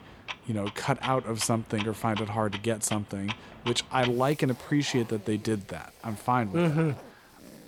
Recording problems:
household noises; noticeable; throughout; 10 dB below the speech

